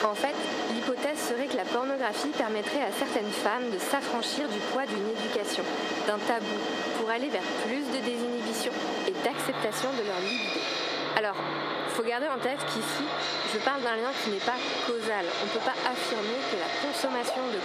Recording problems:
squashed, flat; heavily
thin; very slightly; fading below 300 Hz
machinery noise; loud; throughout; 1 dB below the speech
animal sounds; noticeable; throughout; 15 dB below the speech

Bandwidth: 14.5 kHz